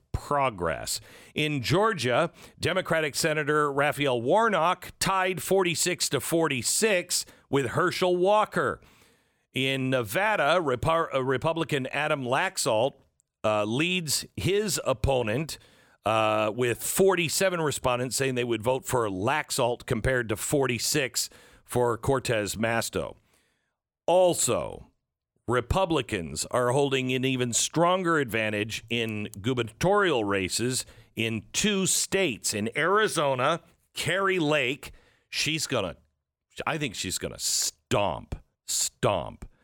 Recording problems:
none

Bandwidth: 17 kHz